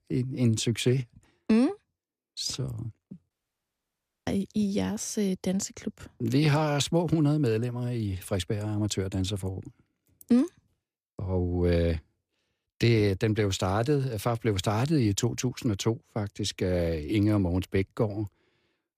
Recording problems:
audio cutting out; at 3.5 s for 1 s

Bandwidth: 15 kHz